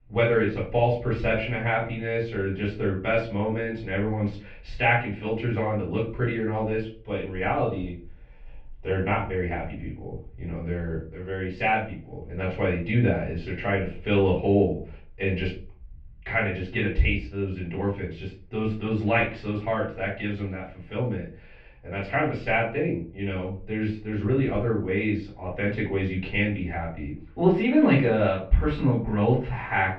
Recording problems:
off-mic speech; far
muffled; very; fading above 2.5 kHz
room echo; slight; dies away in 0.3 s

